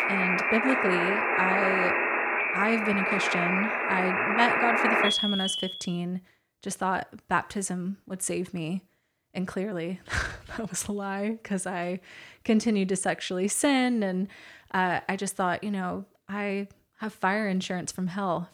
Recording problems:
alarms or sirens; very loud; until 5.5 s; 4 dB above the speech

